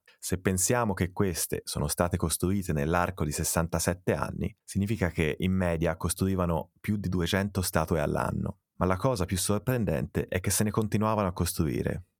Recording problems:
none

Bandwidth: 18.5 kHz